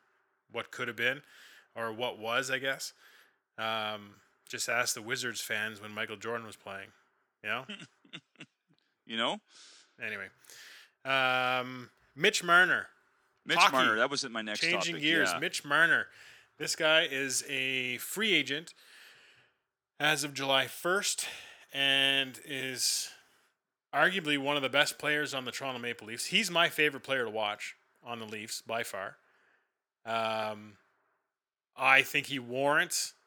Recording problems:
thin; somewhat; fading below 1 kHz

